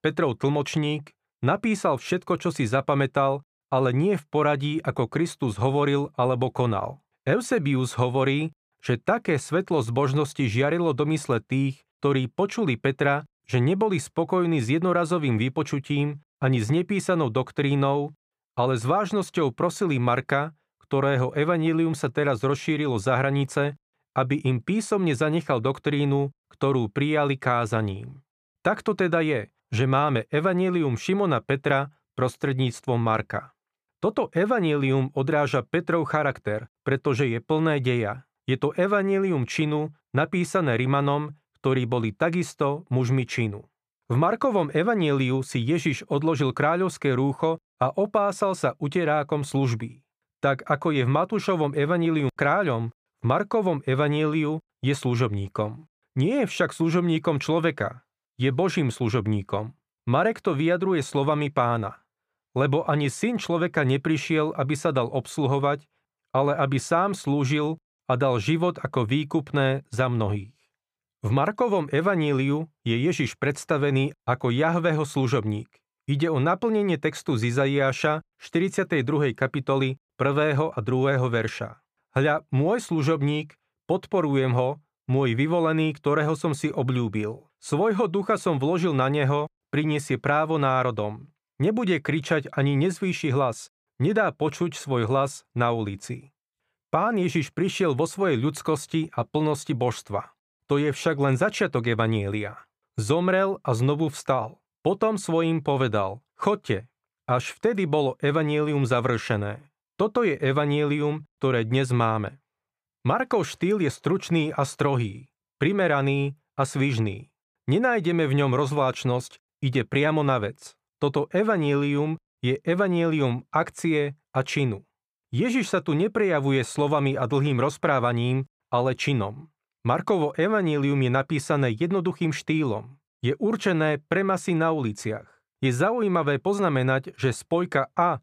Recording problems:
none

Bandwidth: 14.5 kHz